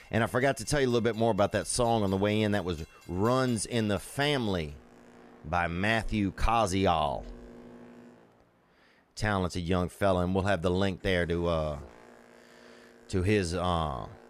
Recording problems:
train or aircraft noise; faint; throughout; 25 dB below the speech

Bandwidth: 14.5 kHz